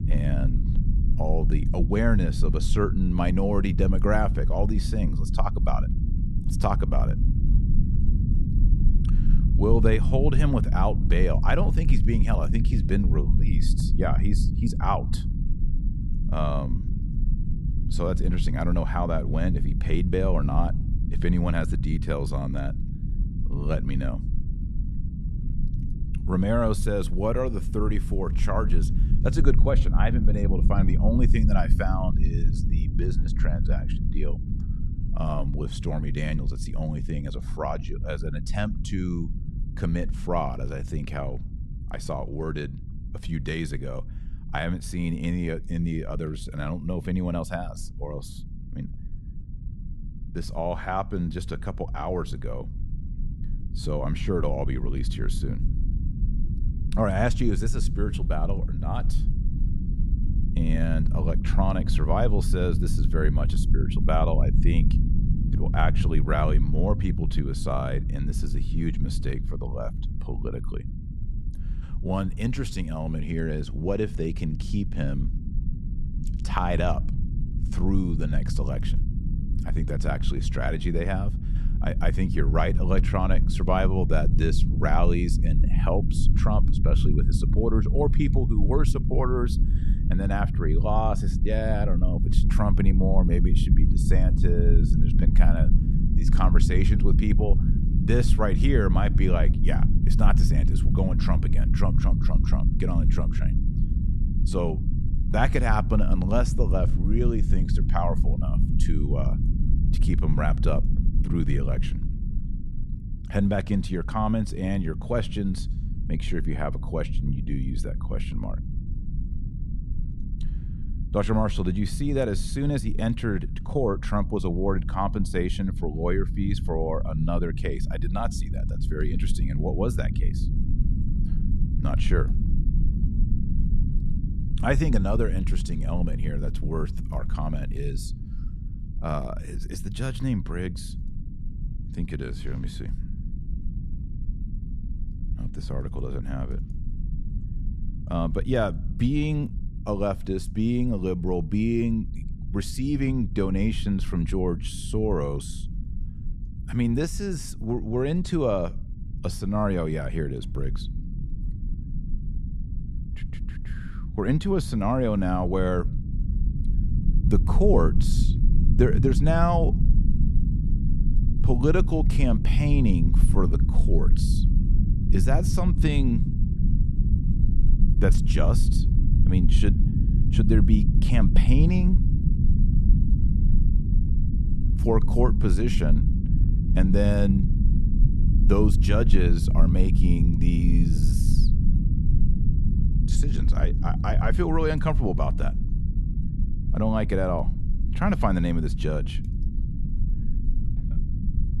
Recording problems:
low rumble; loud; throughout; 10 dB below the speech

